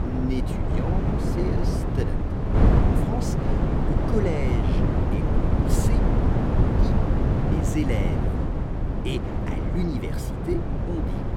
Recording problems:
wind noise on the microphone; heavy; 4 dB above the speech

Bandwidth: 16.5 kHz